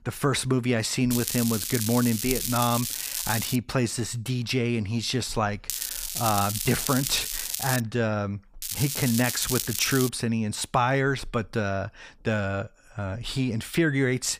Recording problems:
crackling; loud; from 1 to 3.5 s, from 5.5 to 8 s and from 8.5 to 10 s; 3 dB below the speech

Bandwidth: 15 kHz